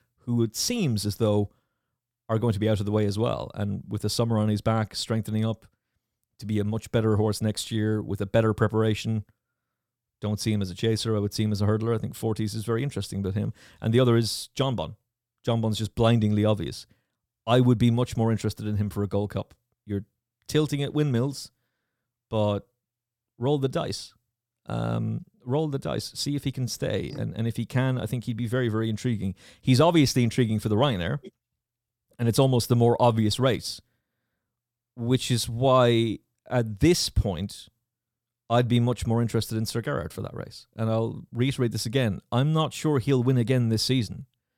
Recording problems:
none

